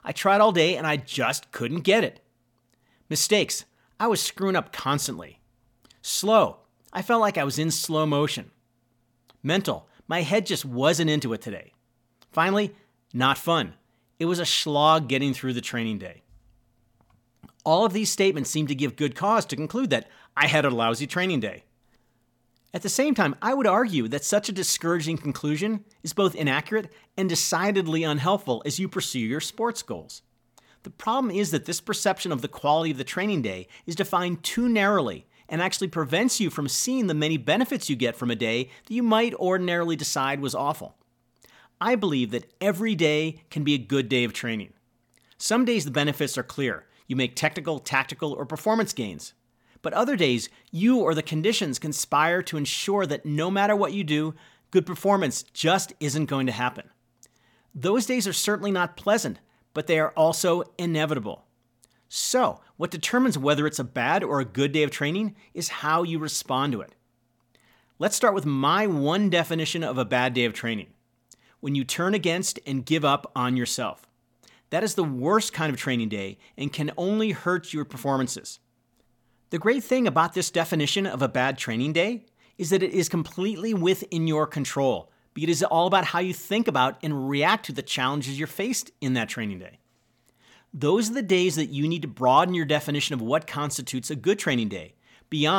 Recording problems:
abrupt cut into speech; at the end

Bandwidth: 17.5 kHz